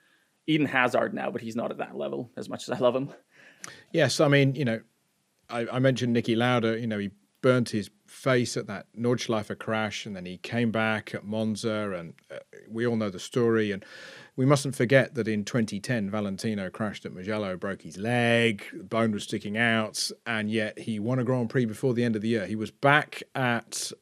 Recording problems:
none

